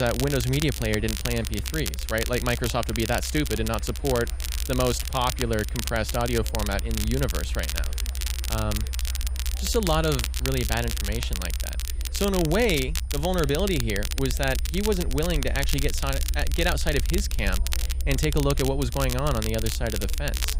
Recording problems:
crackle, like an old record; loud; 6 dB below the speech
high-pitched whine; faint; throughout; 9.5 kHz, 25 dB below the speech
chatter from many people; faint; throughout; 25 dB below the speech
low rumble; faint; throughout; 25 dB below the speech
abrupt cut into speech; at the start

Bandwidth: 15.5 kHz